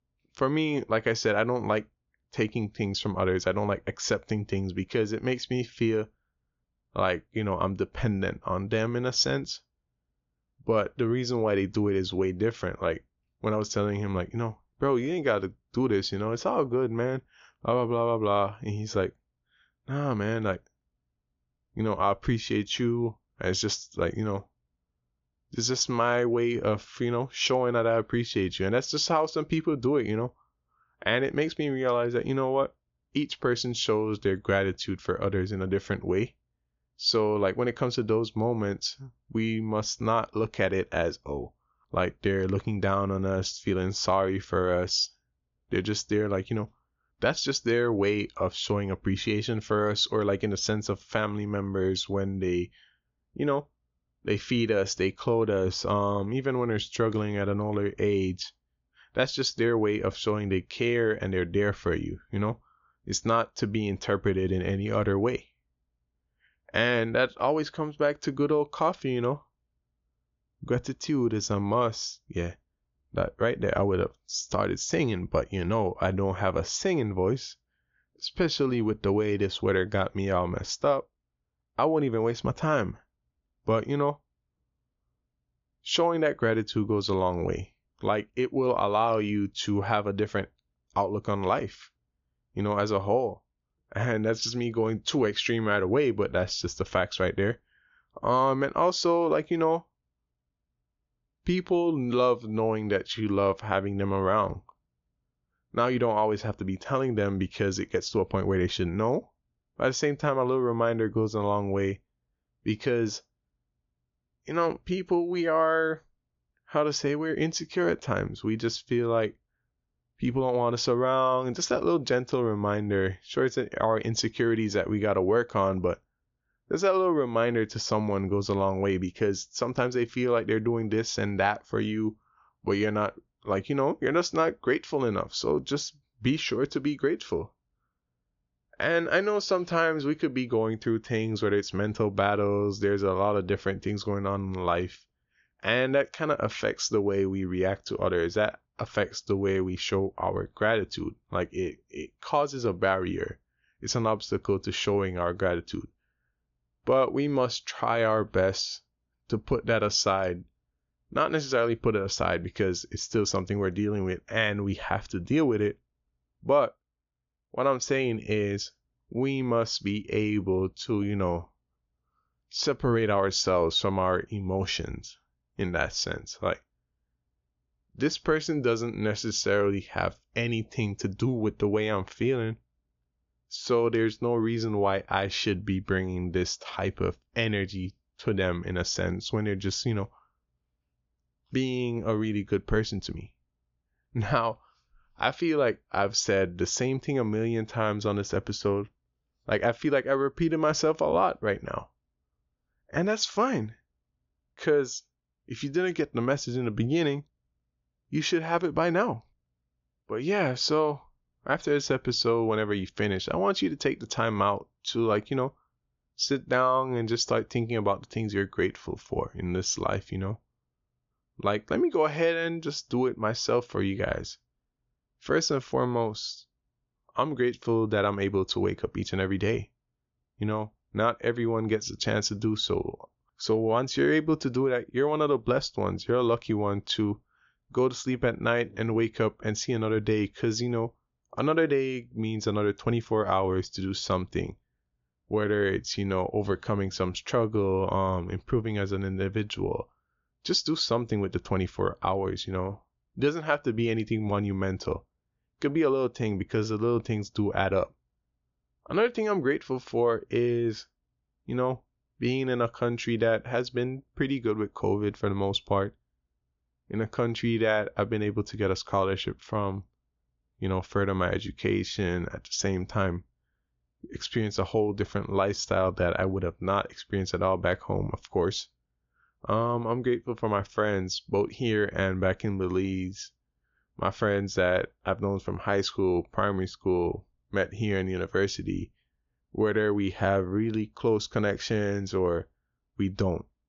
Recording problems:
high frequencies cut off; noticeable; nothing above 7 kHz

